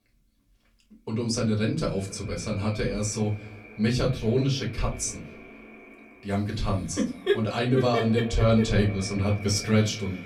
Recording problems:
off-mic speech; far
echo of what is said; noticeable; throughout; 250 ms later, 15 dB below the speech
room echo; very slight; dies away in 0.3 s

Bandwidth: 19 kHz